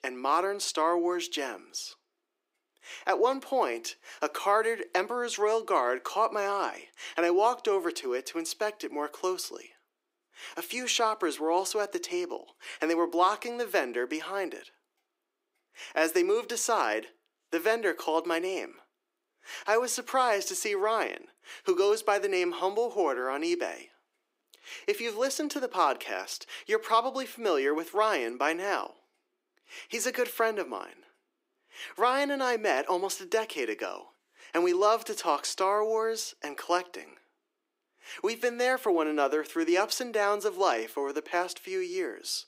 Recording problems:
thin; very; fading below 350 Hz

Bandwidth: 15.5 kHz